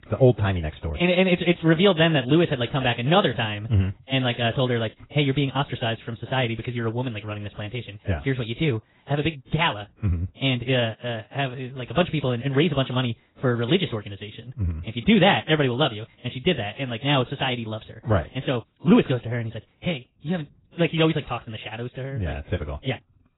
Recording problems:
garbled, watery; badly; nothing above 4 kHz
wrong speed, natural pitch; too fast; 1.6 times normal speed

